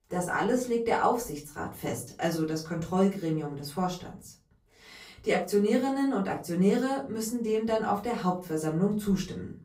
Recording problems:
off-mic speech; far
room echo; slight; dies away in 0.3 s

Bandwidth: 15.5 kHz